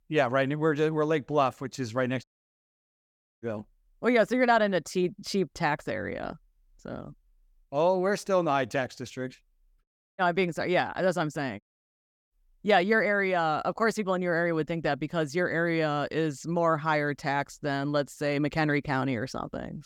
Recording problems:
audio cutting out; at 2 s for 1 s, at 10 s and at 12 s for 0.5 s

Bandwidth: 17.5 kHz